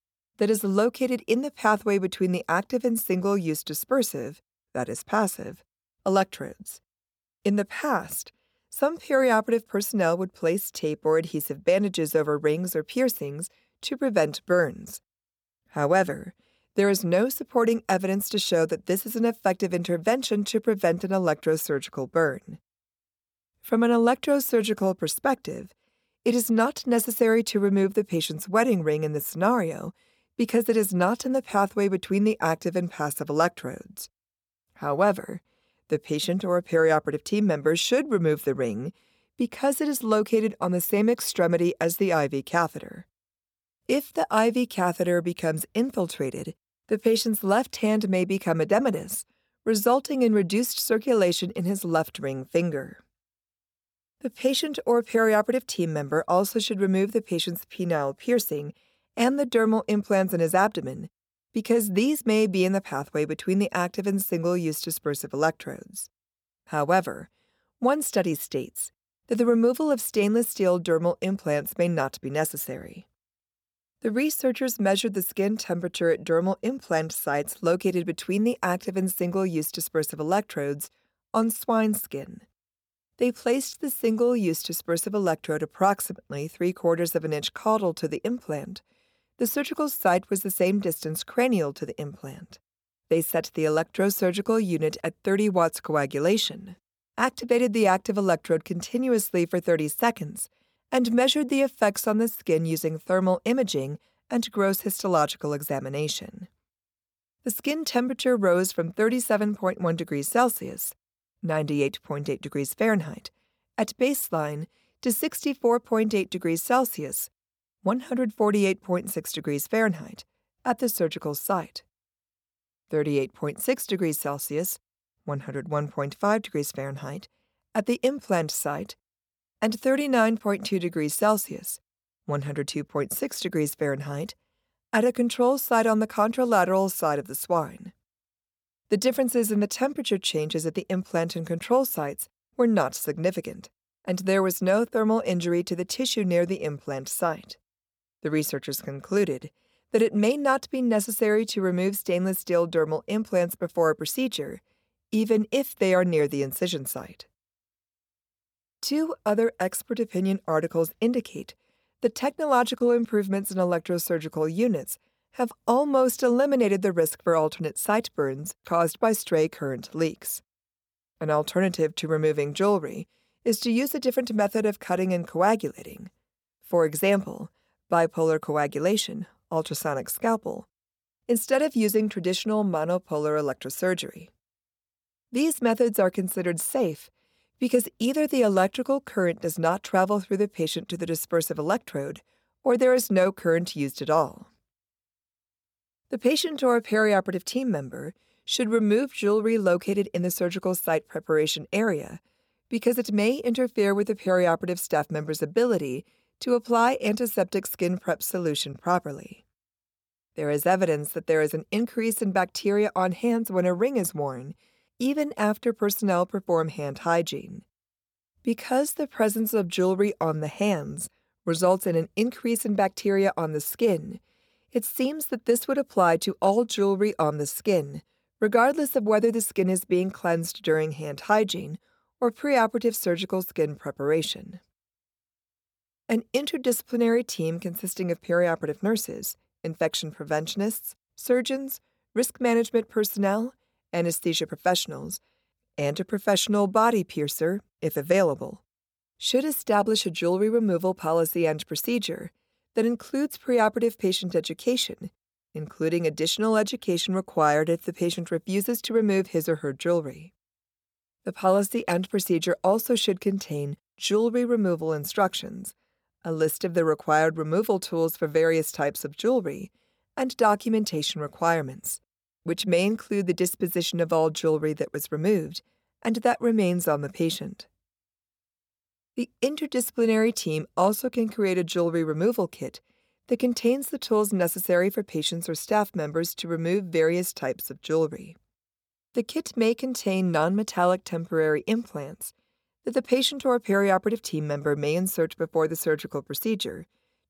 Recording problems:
none

